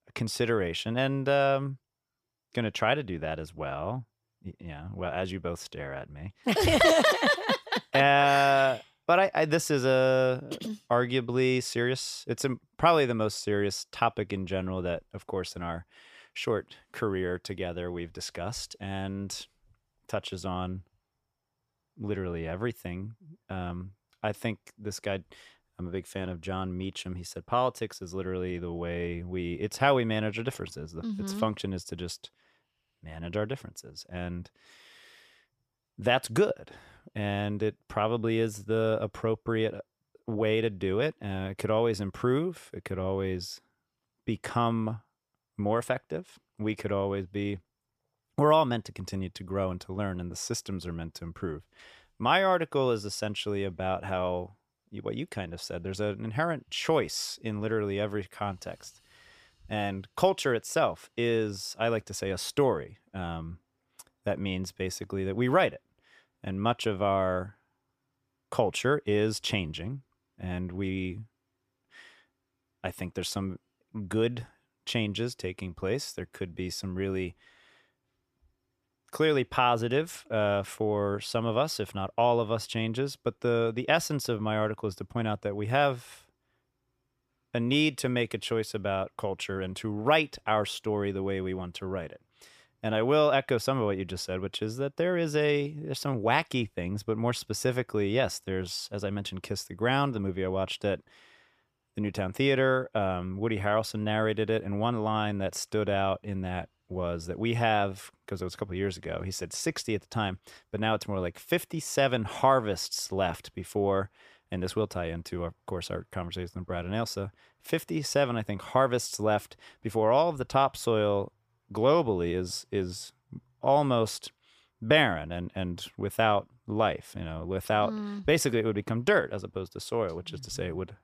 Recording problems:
none

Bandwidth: 14.5 kHz